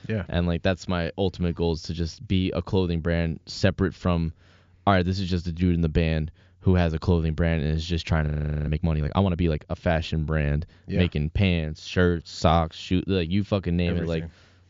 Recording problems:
high frequencies cut off; noticeable; nothing above 7.5 kHz
audio freezing; at 8.5 s

